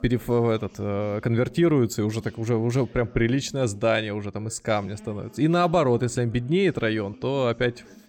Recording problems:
background chatter; faint; throughout; 2 voices, 25 dB below the speech

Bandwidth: 17 kHz